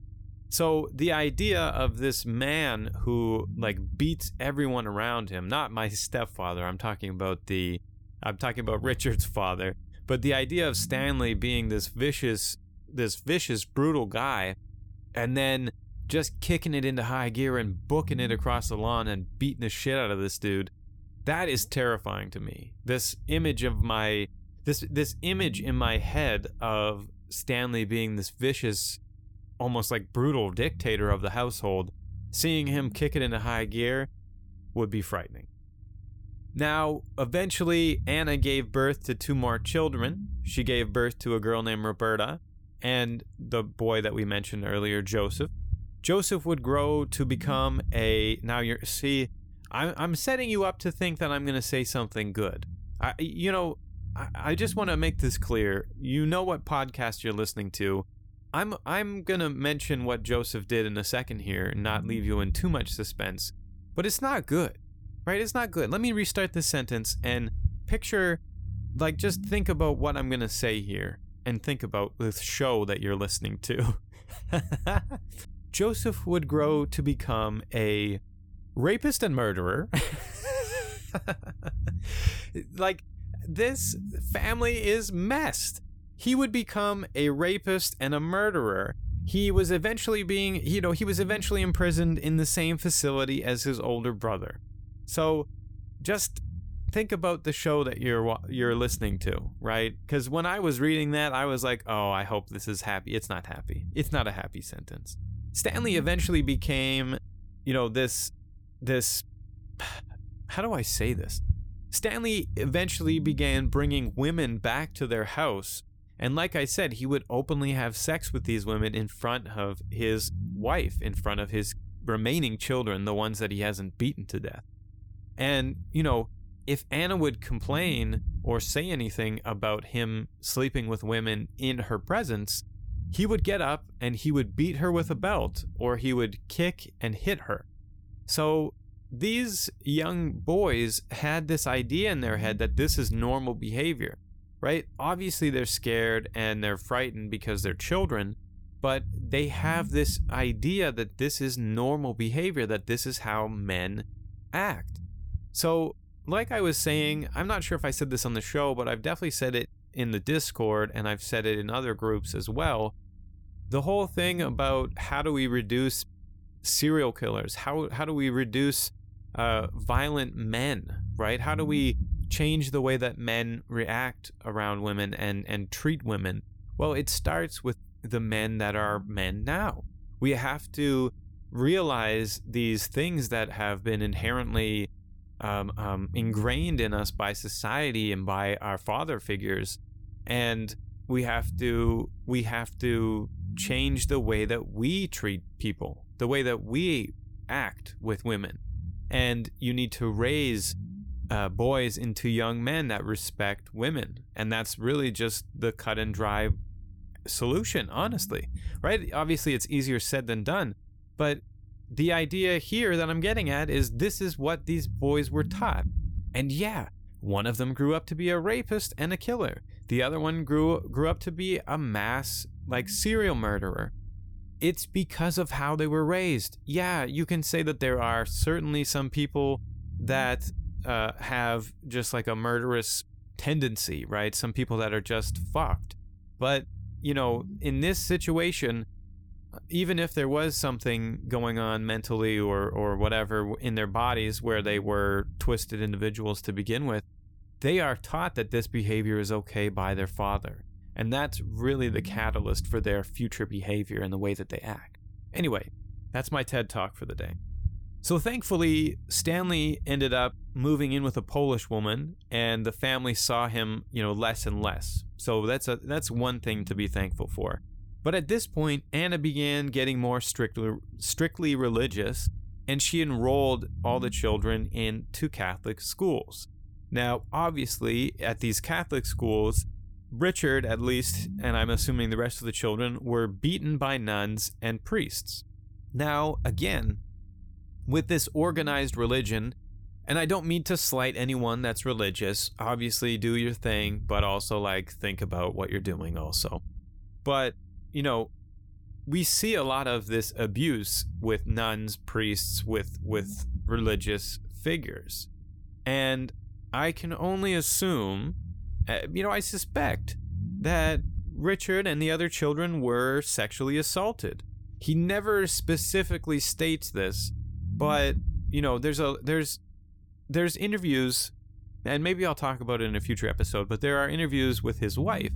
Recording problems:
low rumble; faint; throughout; 25 dB below the speech

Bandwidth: 19 kHz